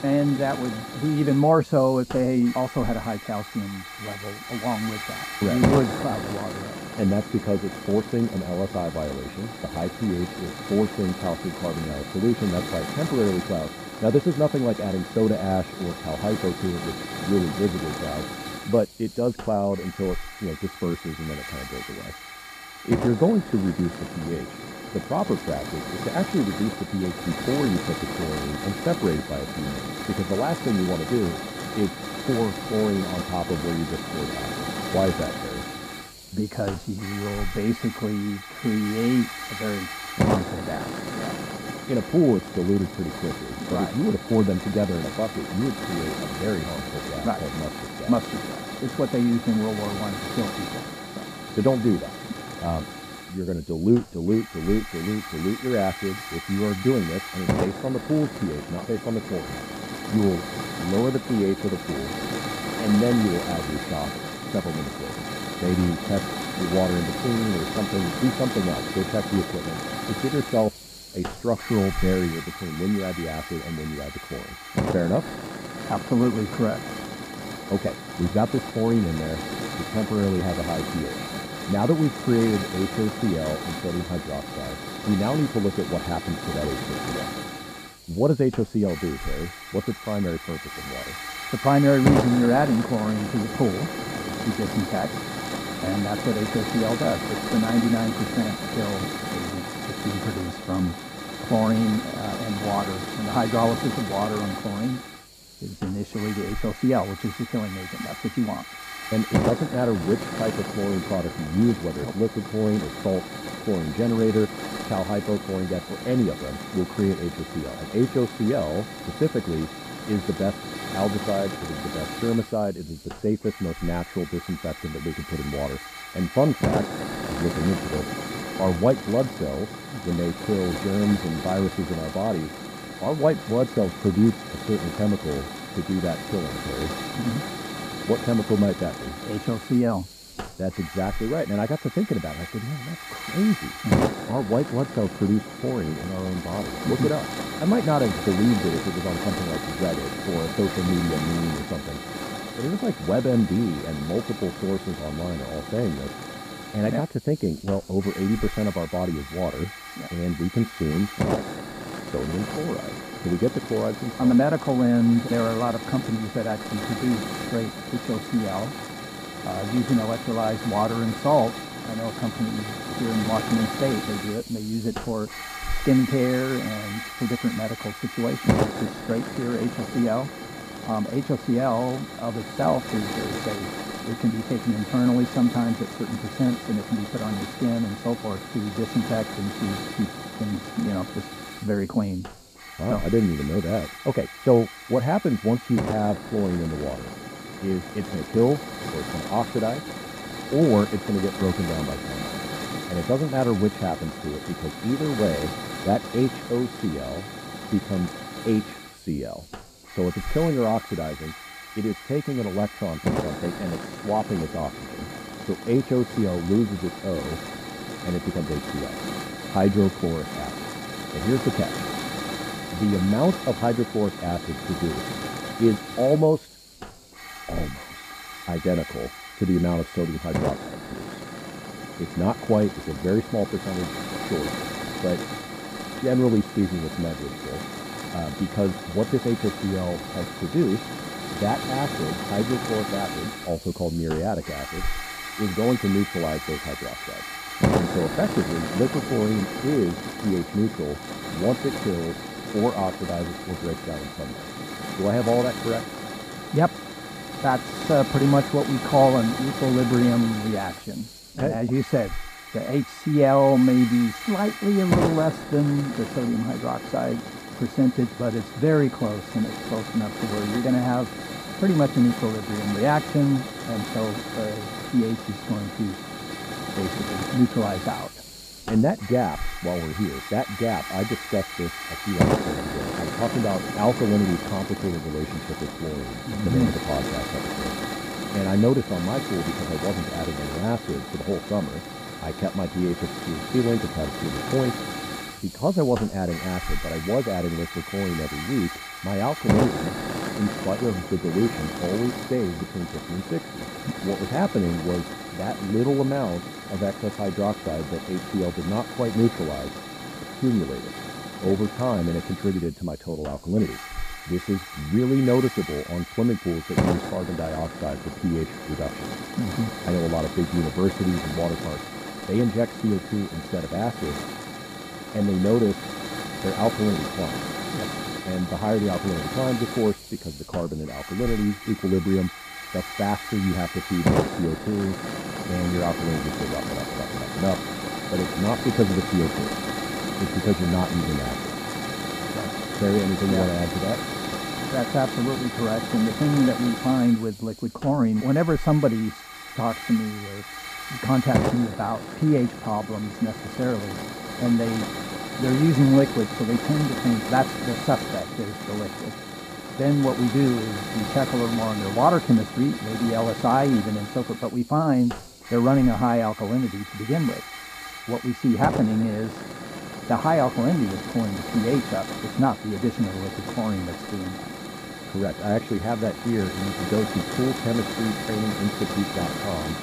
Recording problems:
muffled; very; fading above 2 kHz
hiss; loud; throughout; 7 dB below the speech

